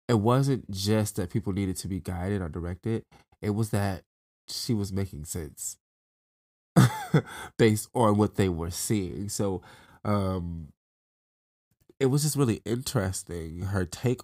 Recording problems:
none

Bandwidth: 15.5 kHz